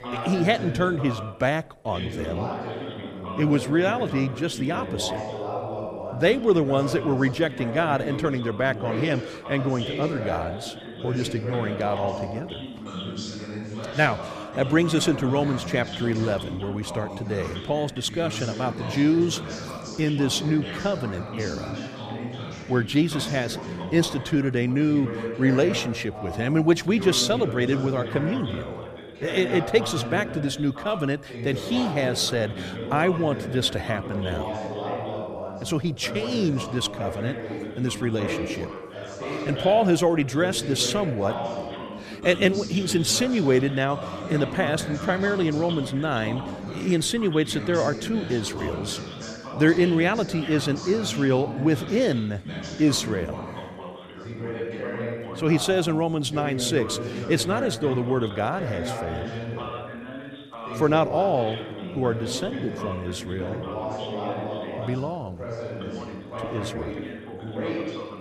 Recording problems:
background chatter; loud; throughout; 2 voices, 8 dB below the speech

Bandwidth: 14.5 kHz